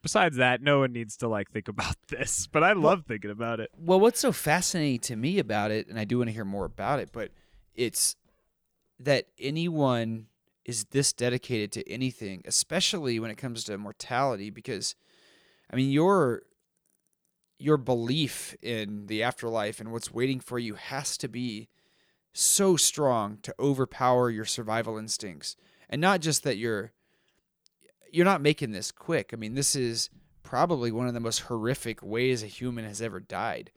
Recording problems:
none

